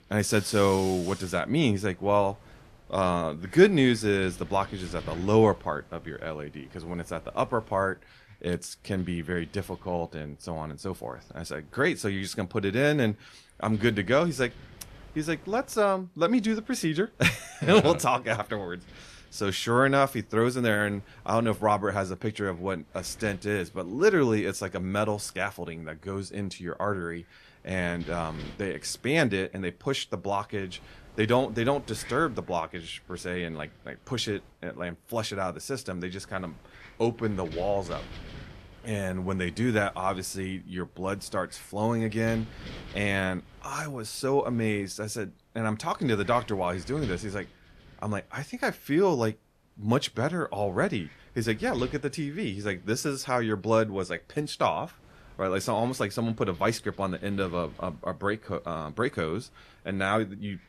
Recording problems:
wind noise on the microphone; occasional gusts; 25 dB below the speech

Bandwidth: 14 kHz